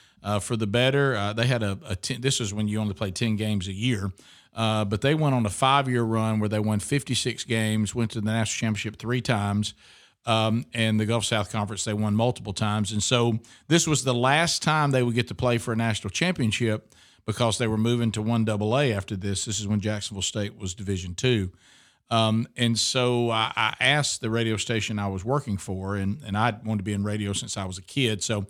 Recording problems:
none

